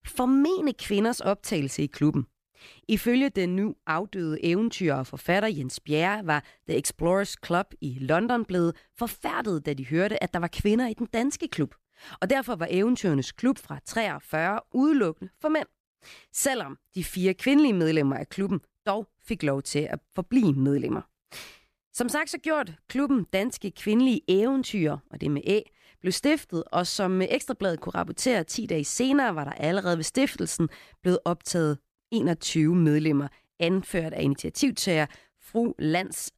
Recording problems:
none

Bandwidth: 14.5 kHz